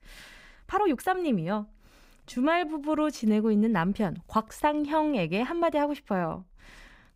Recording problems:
uneven, jittery; strongly; from 0.5 to 4.5 s

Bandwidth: 15.5 kHz